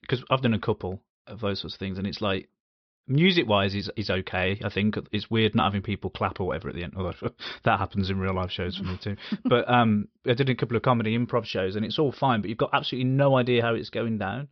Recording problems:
high frequencies cut off; noticeable; nothing above 5.5 kHz

